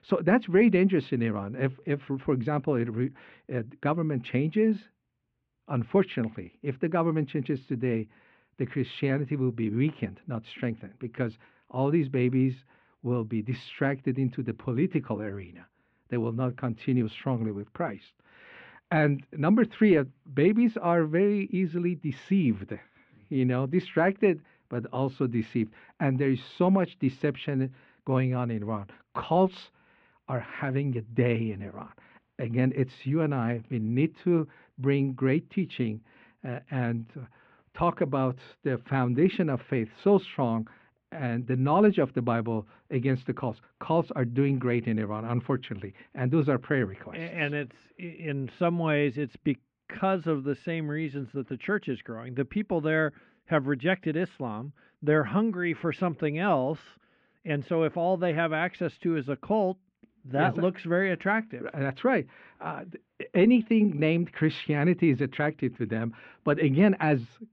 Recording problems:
muffled; very; fading above 3 kHz

